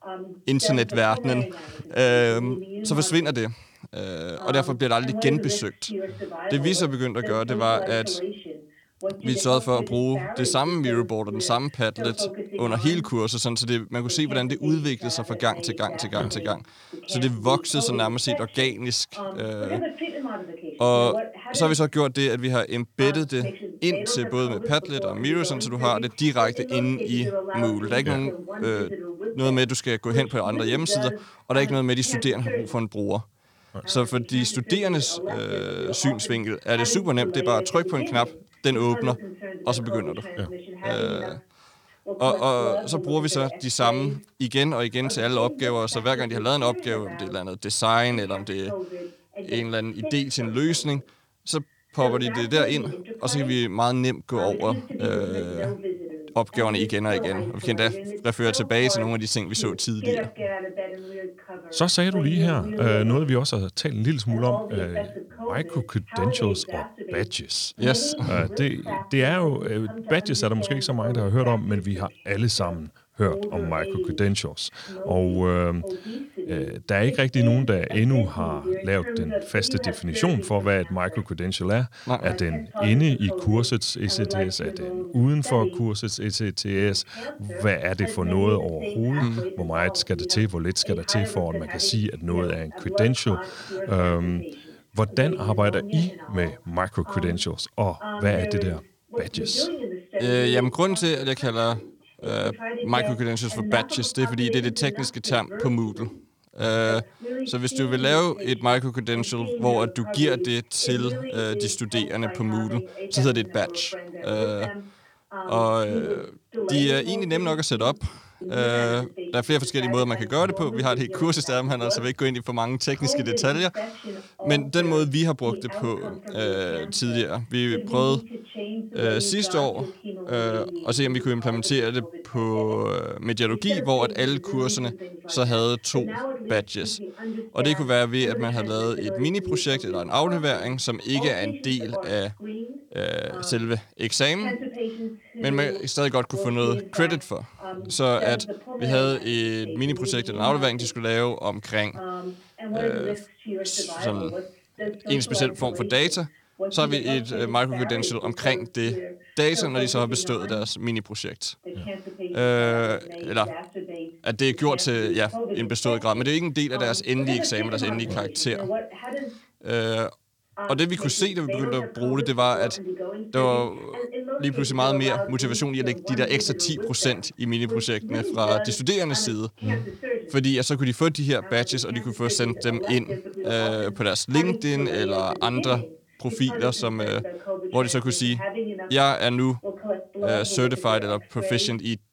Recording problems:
voice in the background; loud; throughout; 8 dB below the speech

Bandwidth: 19 kHz